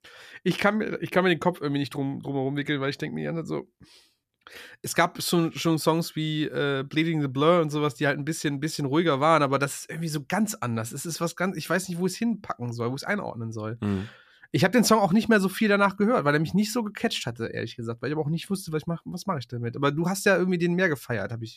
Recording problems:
none

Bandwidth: 14.5 kHz